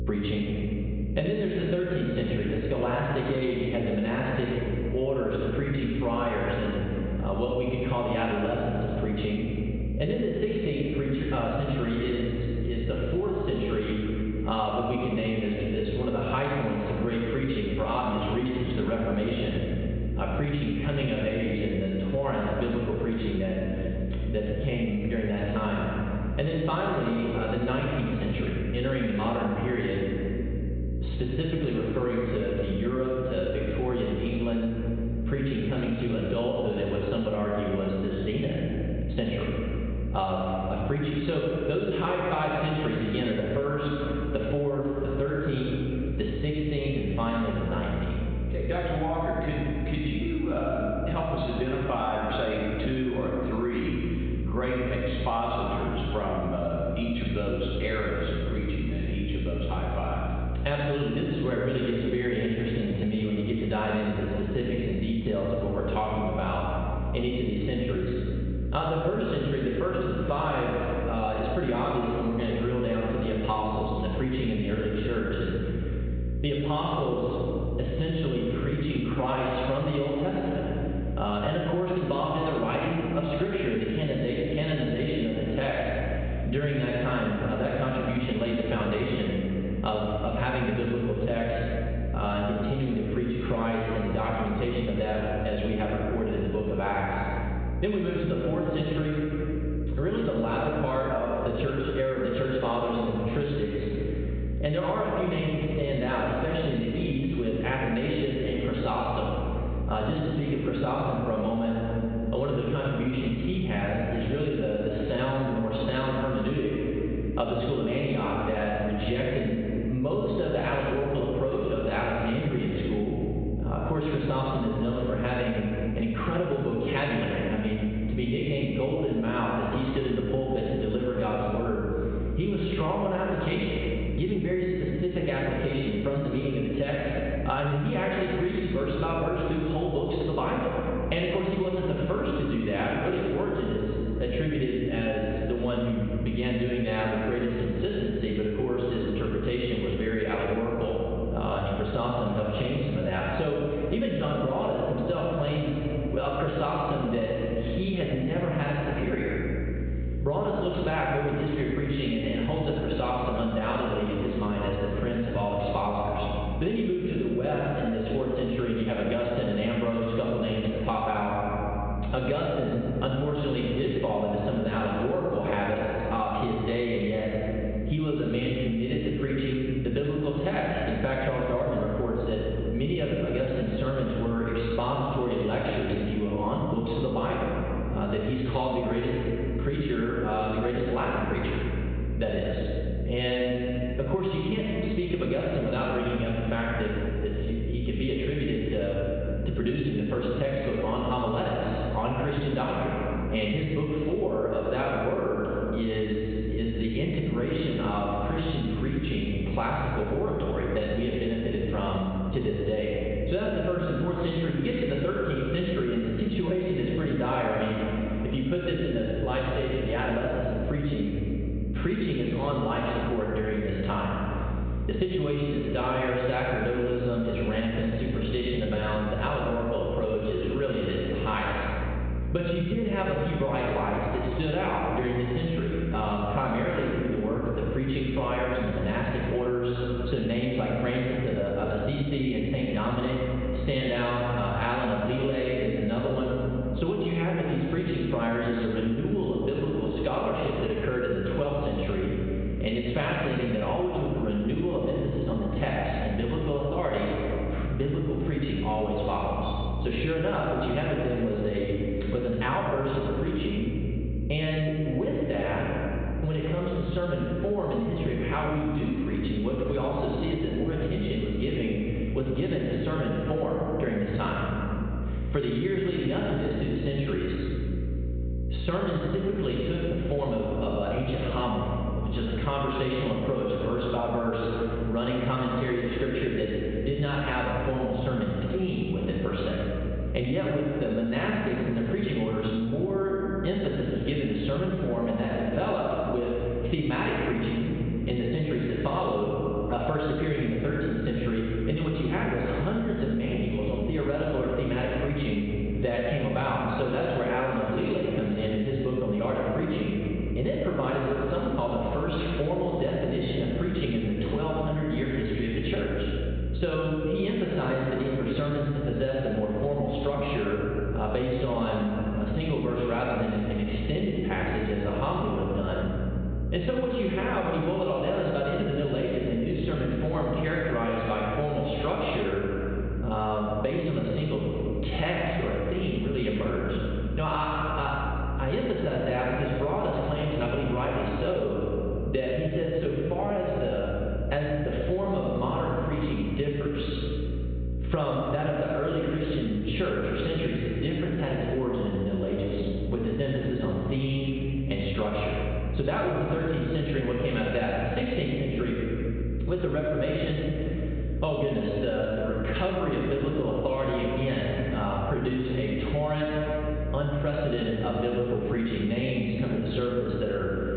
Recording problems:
off-mic speech; far
high frequencies cut off; severe; nothing above 4 kHz
echo of what is said; noticeable; throughout; 80 ms later, 10 dB below the speech
room echo; noticeable; dies away in 1.5 s
squashed, flat; somewhat
electrical hum; noticeable; throughout; 60 Hz, 20 dB below the speech

